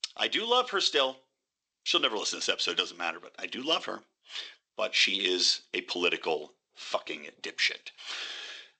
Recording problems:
thin; somewhat; fading below 350 Hz
garbled, watery; slightly; nothing above 8 kHz

